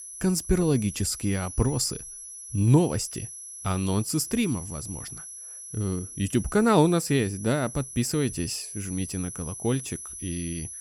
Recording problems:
high-pitched whine; noticeable; throughout; 11 kHz, 10 dB below the speech

